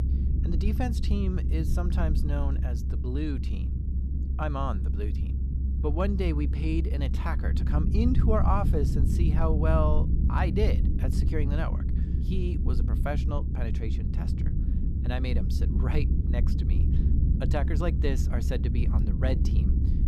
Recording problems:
low rumble; loud; throughout; 7 dB below the speech

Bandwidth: 14.5 kHz